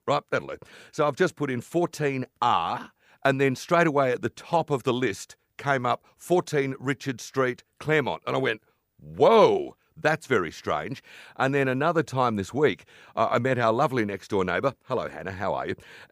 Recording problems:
none

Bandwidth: 15 kHz